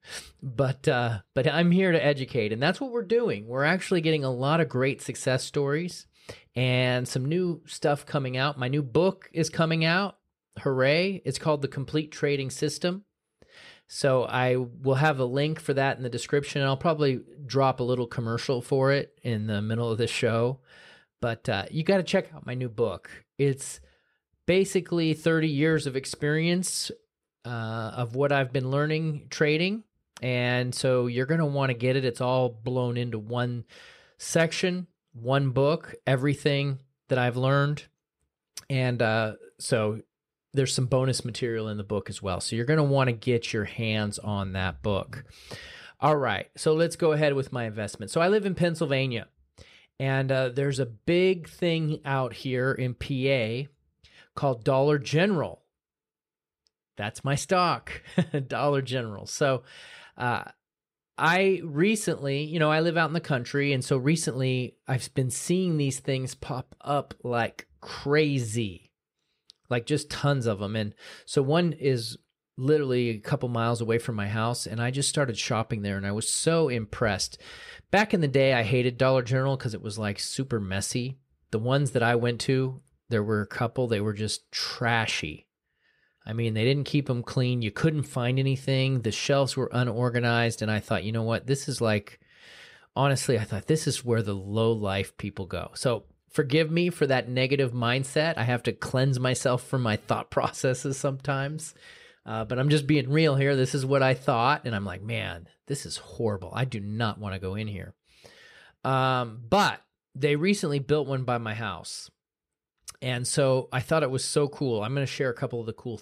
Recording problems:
none

